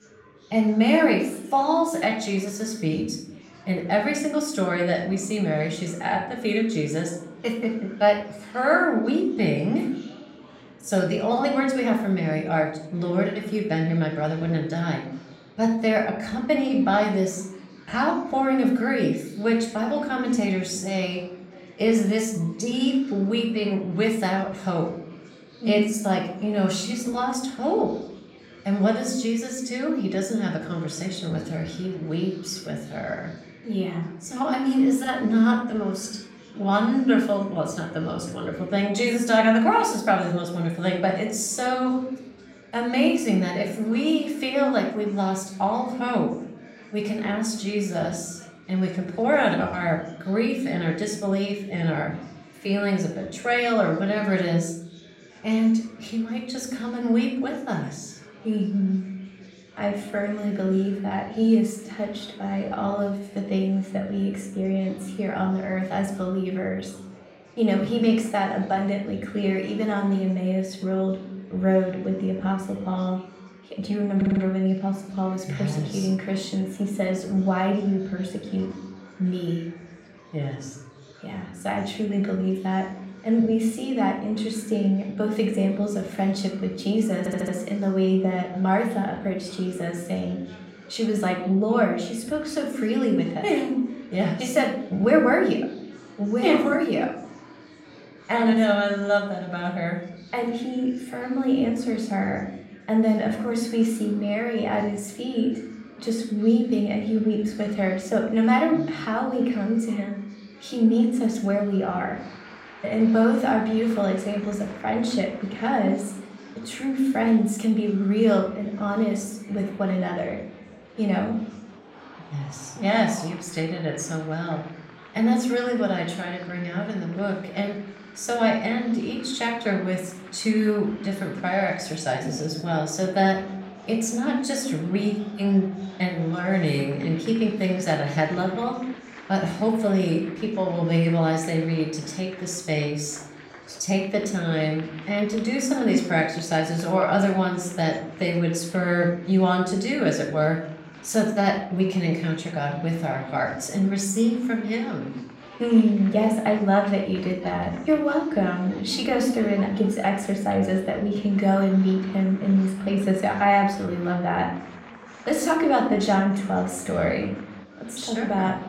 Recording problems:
room echo; noticeable; dies away in 0.6 s
off-mic speech; somewhat distant
chatter from many people; faint; throughout; 20 dB below the speech
audio stuttering; at 1:14 and at 1:27

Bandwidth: 16 kHz